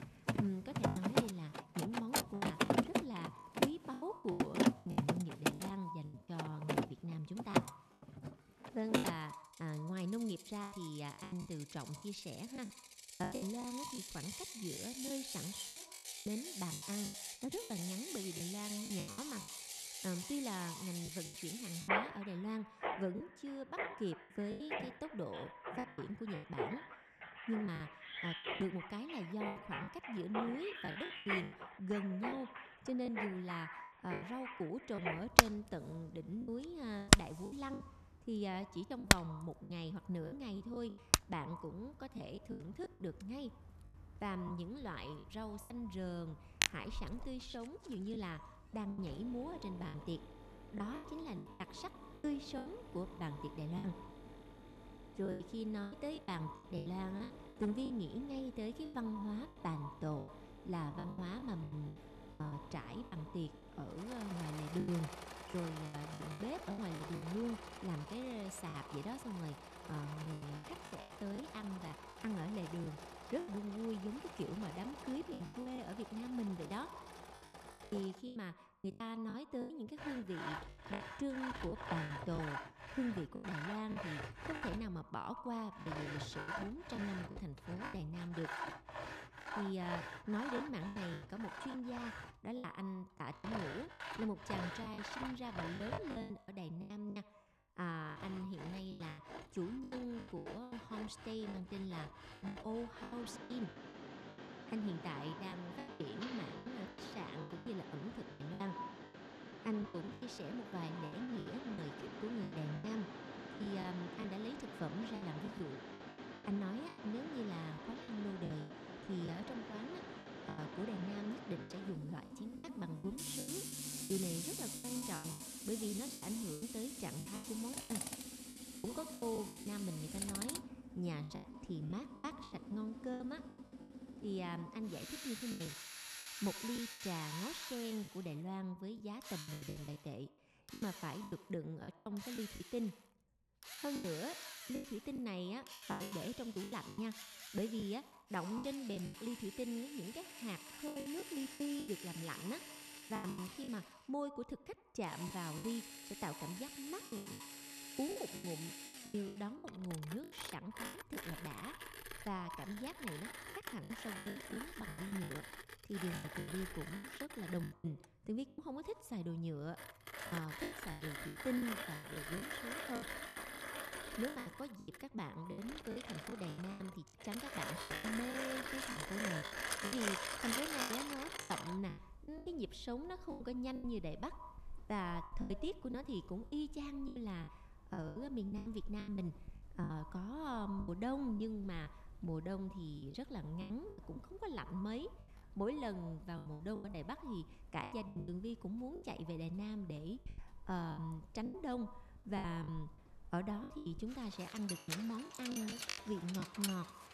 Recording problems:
echo of what is said; noticeable; throughout; 80 ms later, 15 dB below the speech
machinery noise; very loud; throughout; 1 dB above the speech
choppy; very; 13% of the speech affected

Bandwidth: 13.5 kHz